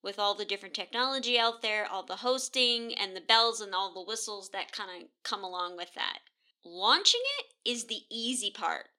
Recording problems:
thin; somewhat; fading below 350 Hz

